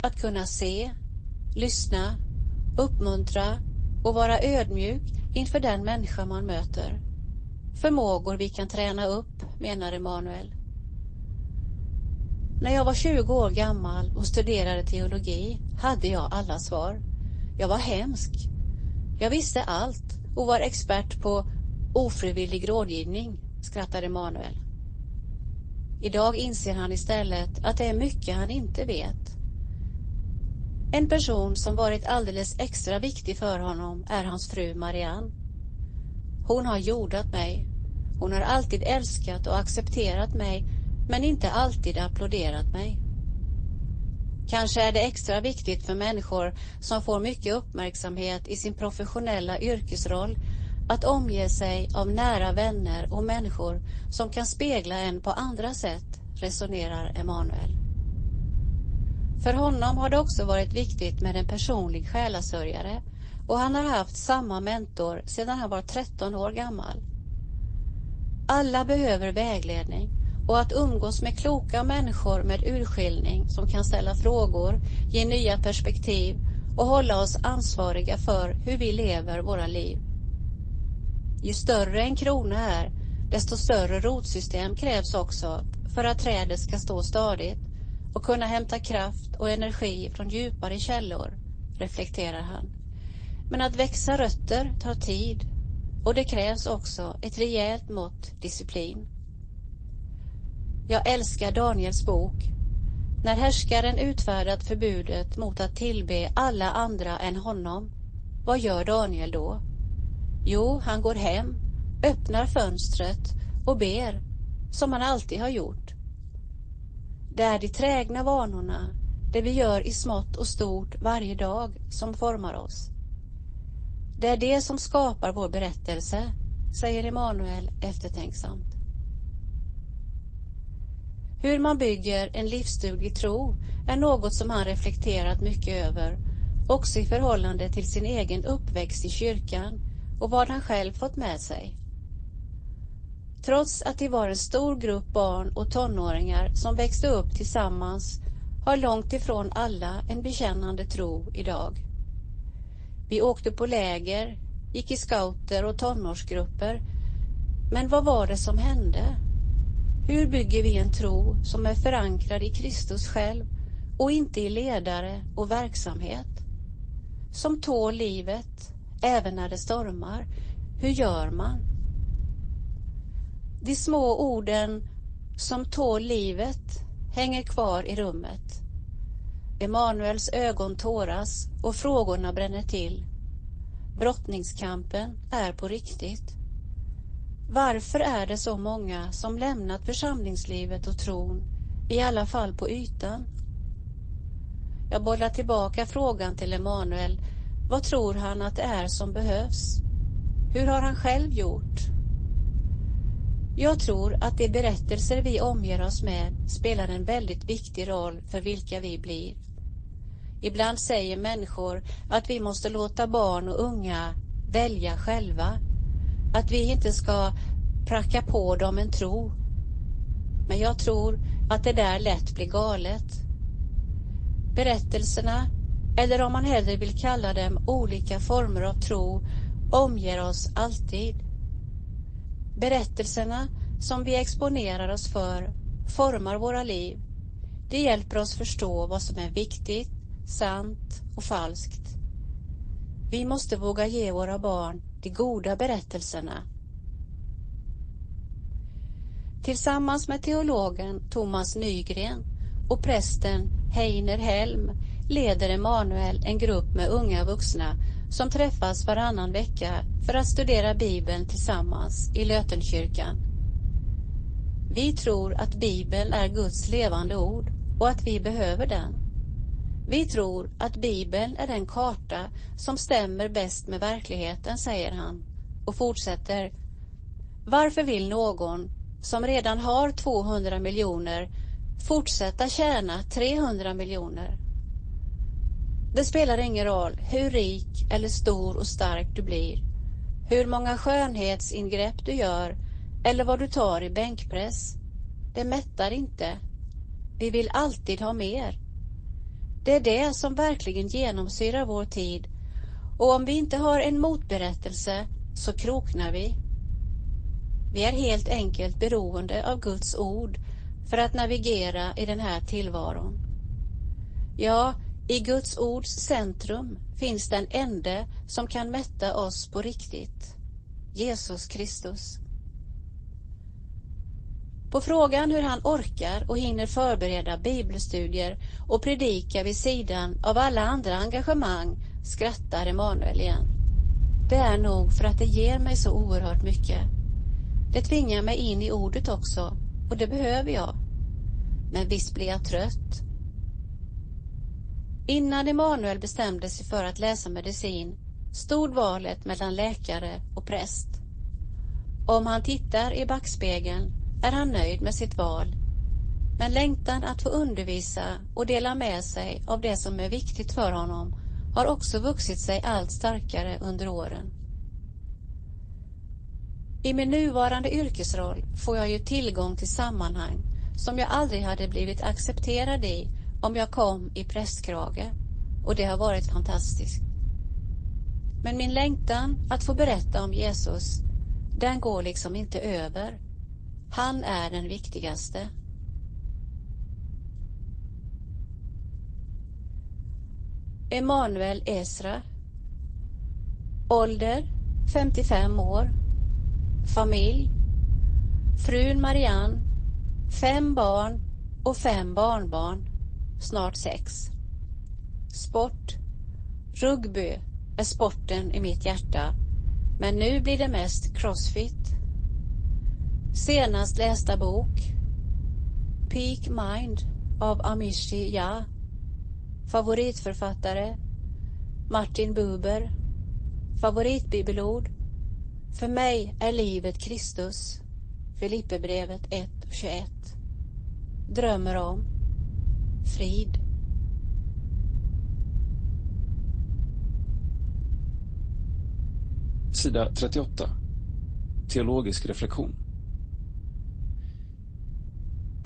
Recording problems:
garbled, watery; slightly; nothing above 8 kHz
low rumble; faint; throughout; 20 dB below the speech

